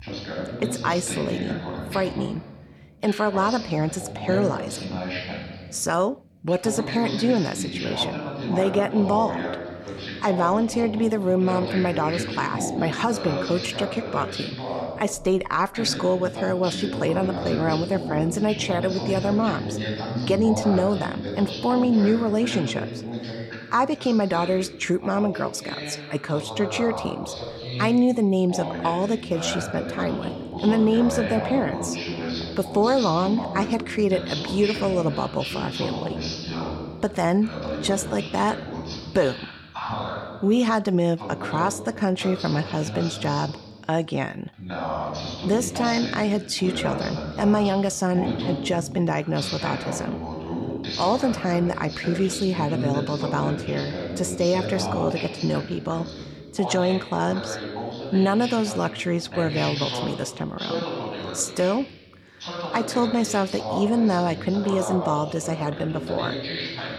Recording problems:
voice in the background; loud; throughout; 7 dB below the speech

